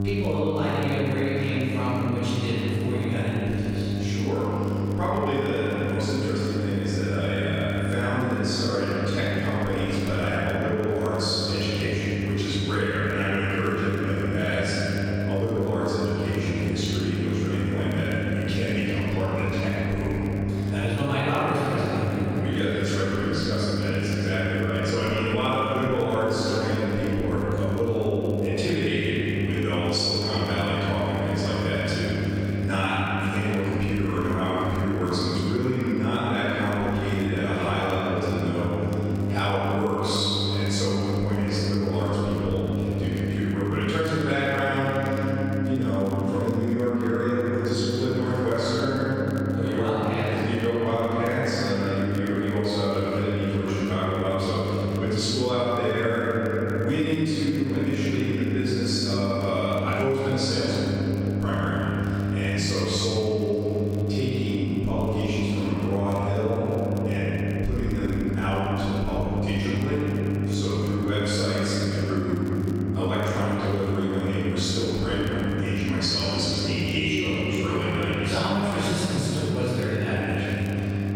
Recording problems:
room echo; strong; dies away in 3 s
off-mic speech; far
squashed, flat; somewhat
electrical hum; noticeable; throughout; 50 Hz, 10 dB below the speech
crackle, like an old record; very faint; 30 dB below the speech

